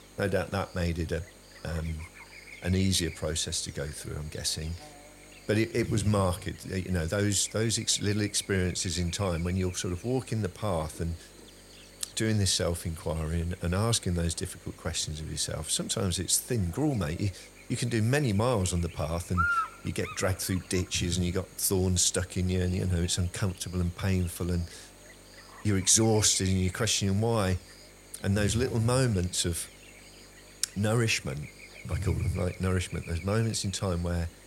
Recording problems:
electrical hum; noticeable; throughout; 50 Hz, 10 dB below the speech

